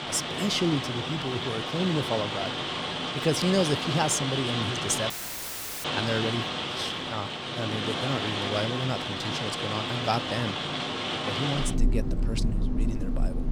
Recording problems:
rain or running water; very loud; throughout; as loud as the speech
audio cutting out; filled with static; at 5 s for 0.5 s

